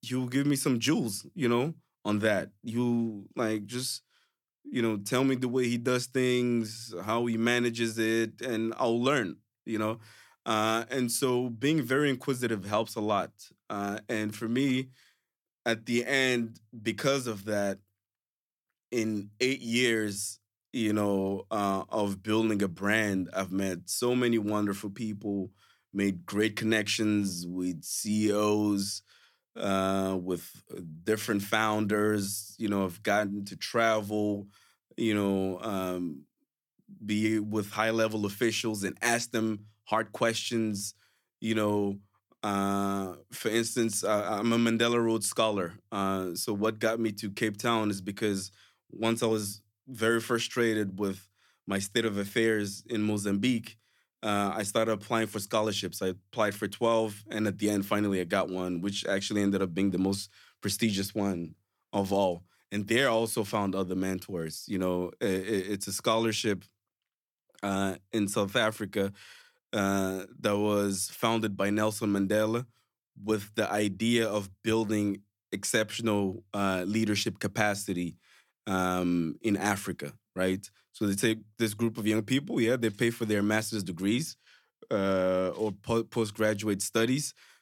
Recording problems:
none

